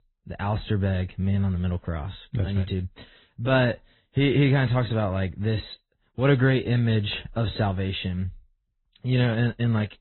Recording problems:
high frequencies cut off; severe; nothing above 4 kHz
garbled, watery; slightly

